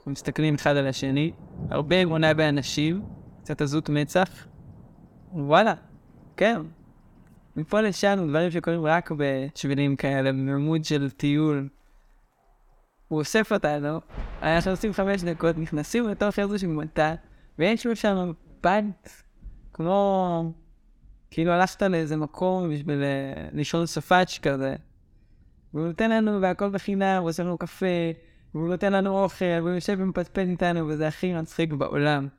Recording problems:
rain or running water; faint; throughout; 20 dB below the speech

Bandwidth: 17.5 kHz